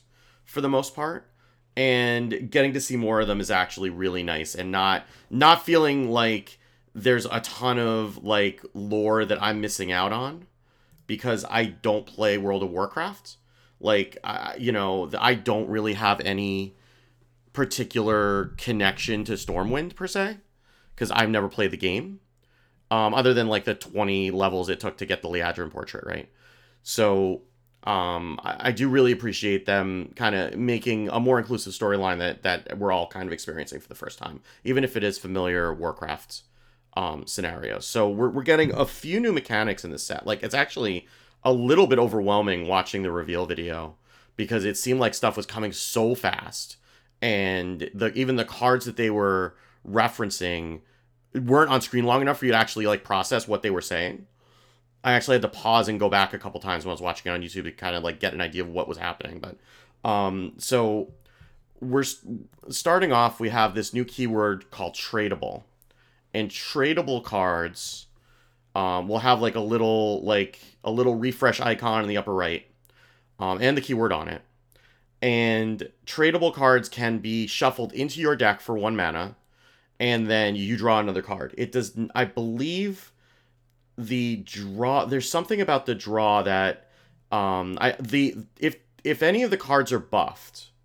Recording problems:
none

